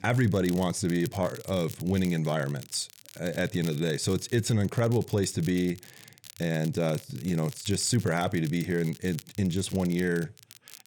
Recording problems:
crackle, like an old record; noticeable; 20 dB below the speech

